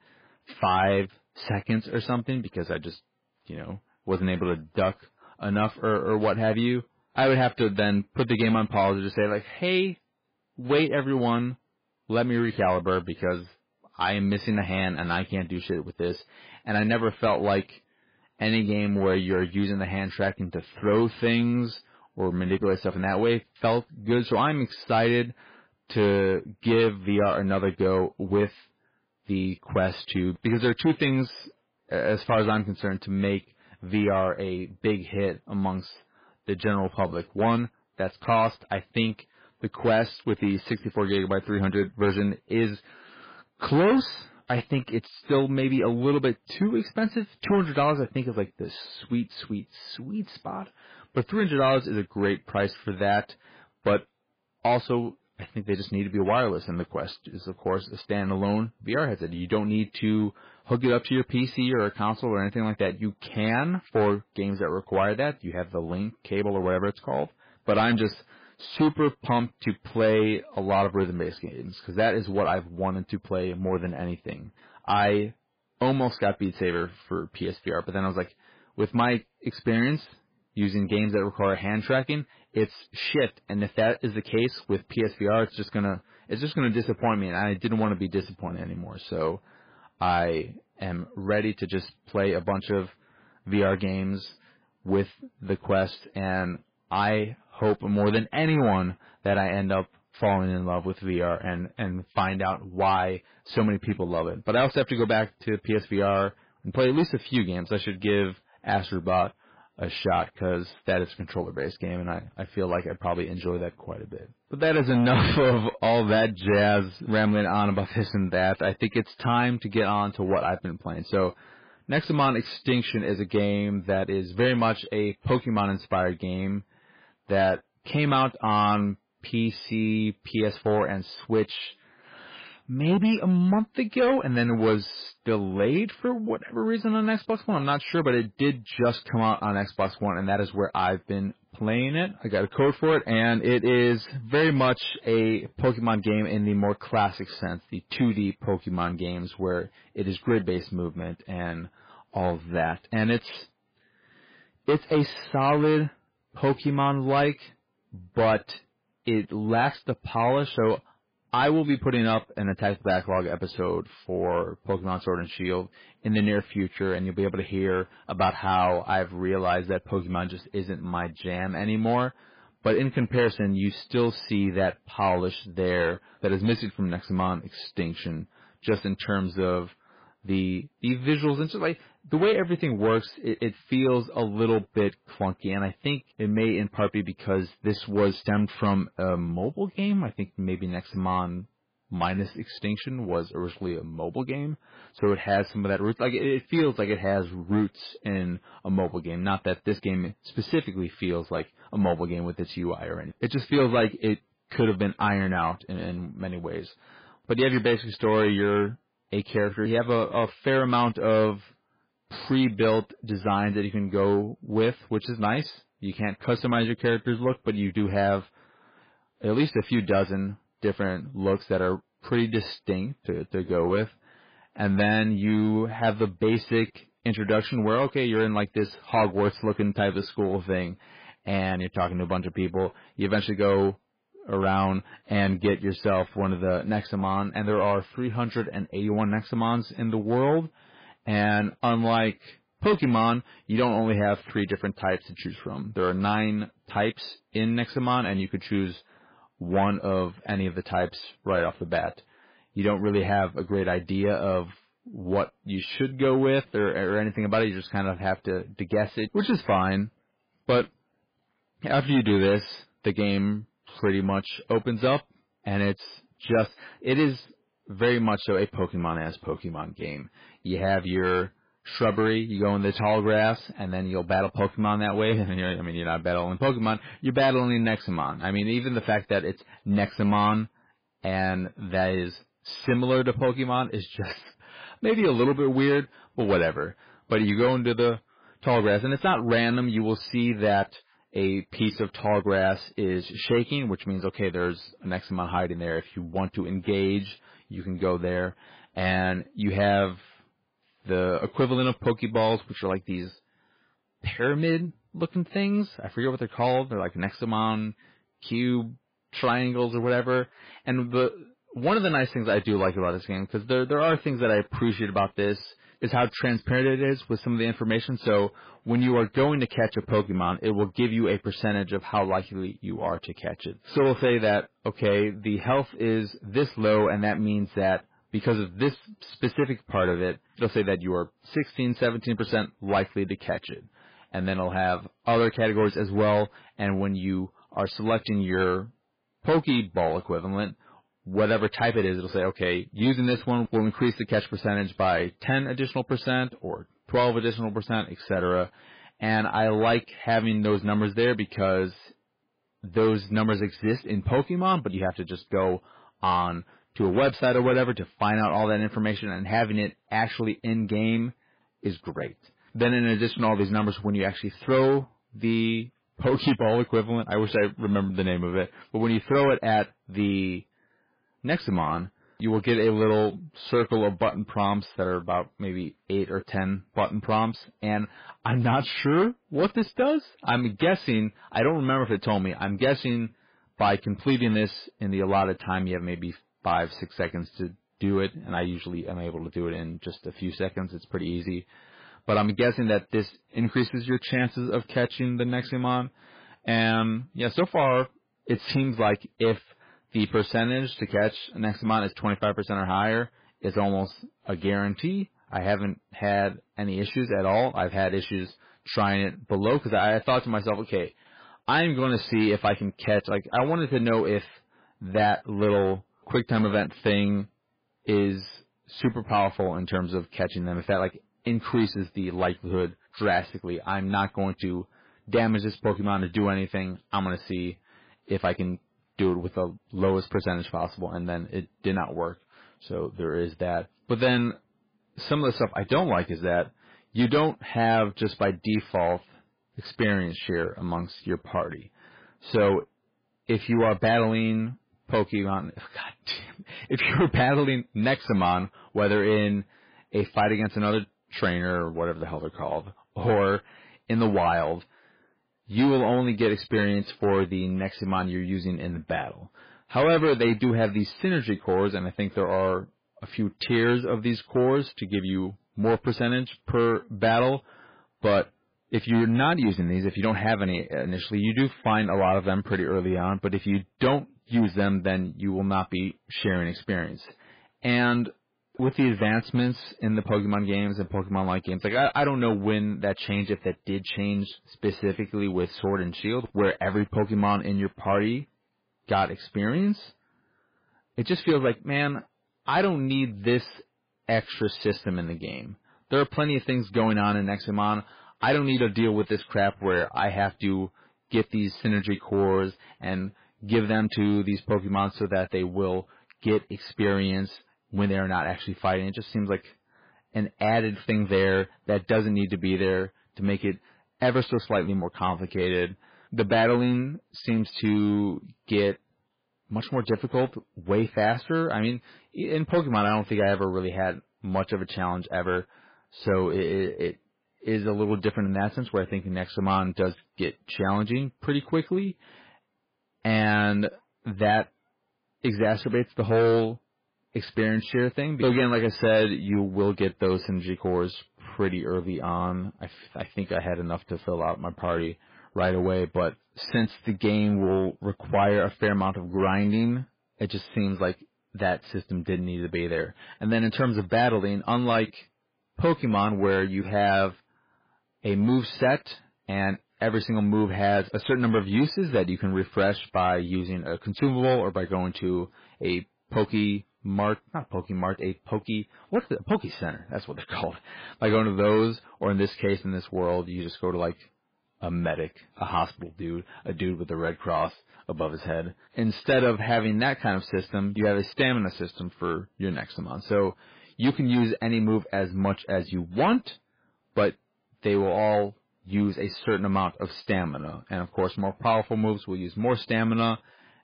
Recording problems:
garbled, watery; badly
distortion; slight; 4% of the sound clipped

